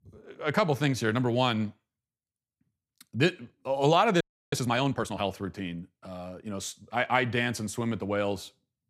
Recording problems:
audio freezing; at 4 s

